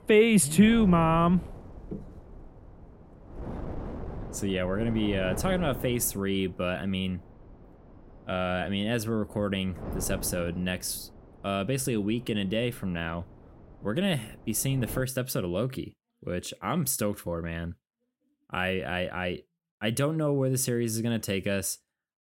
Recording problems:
wind noise on the microphone; occasional gusts; until 15 s; 15 dB below the speech

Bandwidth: 16 kHz